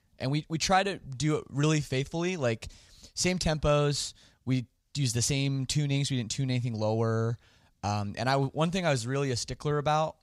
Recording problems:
none

